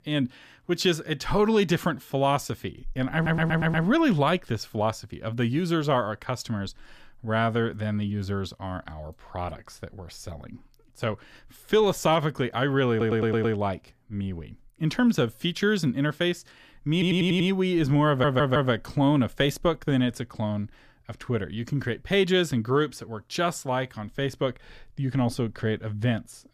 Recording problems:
audio stuttering; 4 times, first at 3 s

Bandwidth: 14.5 kHz